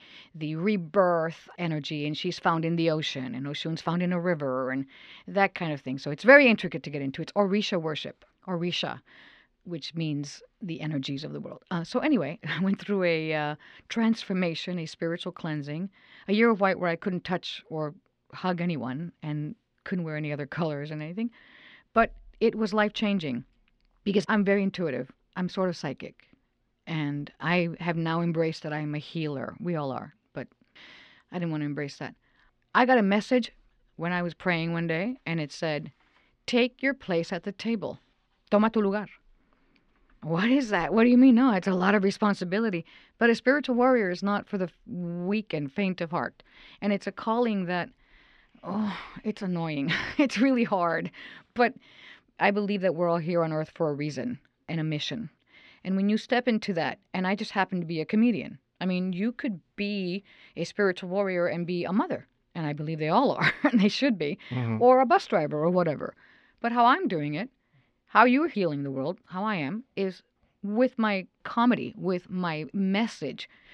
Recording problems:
muffled; very slightly; fading above 3 kHz

